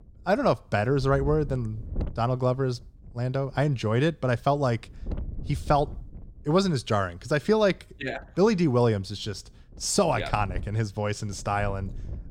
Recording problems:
wind noise on the microphone; occasional gusts; 25 dB below the speech

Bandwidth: 16.5 kHz